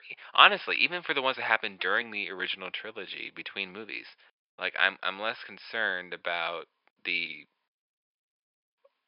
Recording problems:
thin; very; fading below 700 Hz
high frequencies cut off; noticeable; nothing above 5.5 kHz

